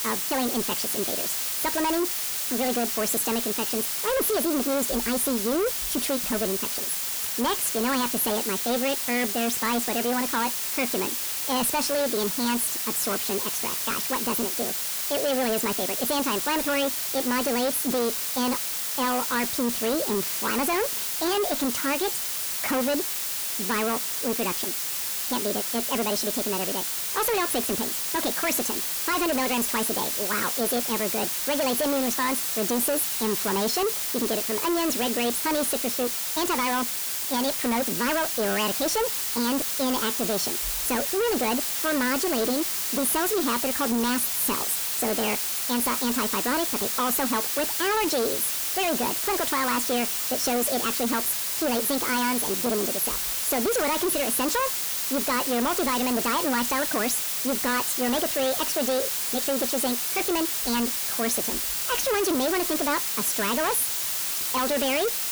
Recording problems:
distortion; heavy; 24% of the sound clipped
wrong speed and pitch; too fast and too high; 1.5 times normal speed
hiss; loud; throughout; as loud as the speech

